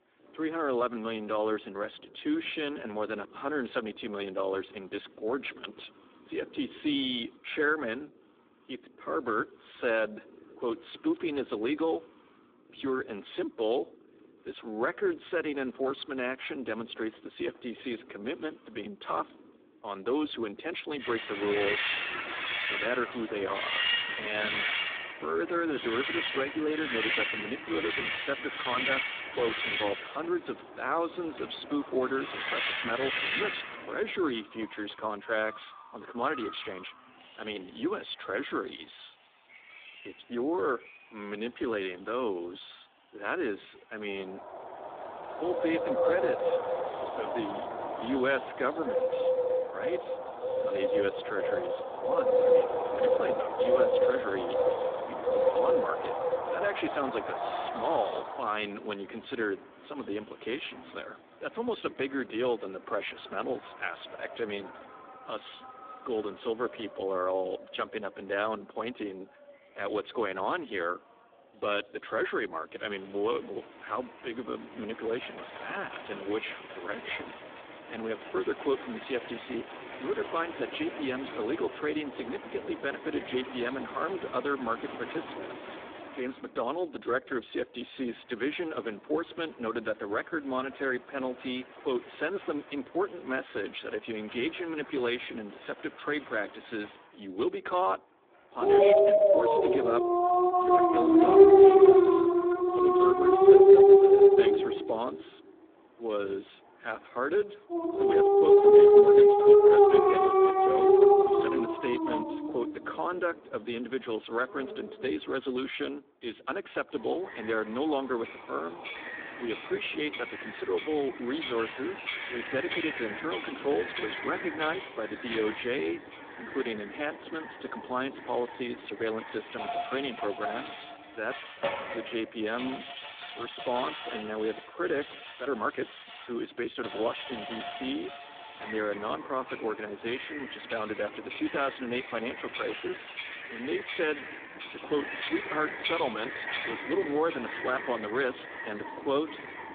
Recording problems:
phone-call audio; poor line
animal sounds; very loud; throughout; 8 dB above the speech
uneven, jittery; strongly; from 1:40 to 2:25

